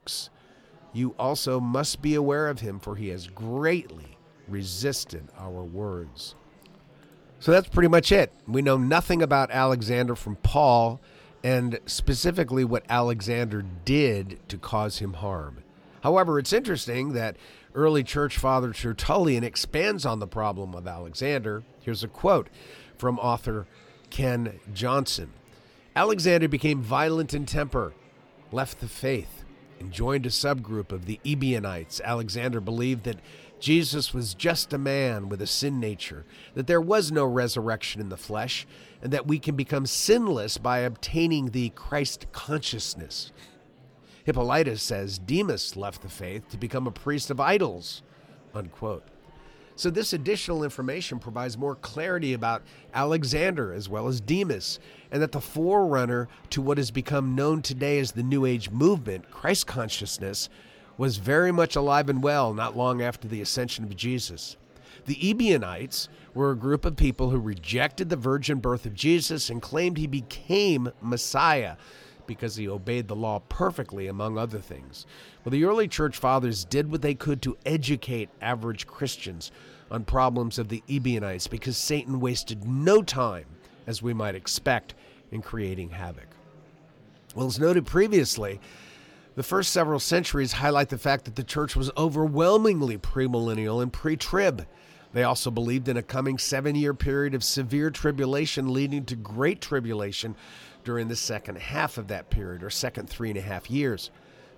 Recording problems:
murmuring crowd; faint; throughout; 30 dB below the speech

